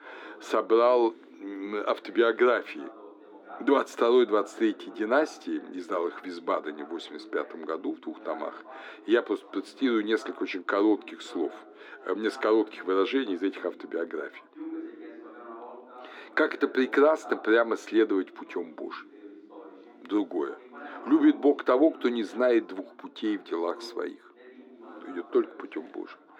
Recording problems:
muffled; very; fading above 3.5 kHz
thin; somewhat; fading below 300 Hz
background chatter; noticeable; throughout; 3 voices, 20 dB below the speech

